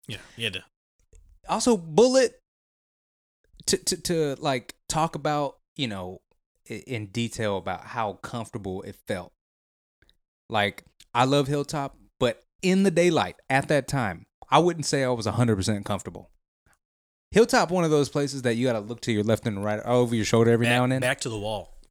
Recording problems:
none

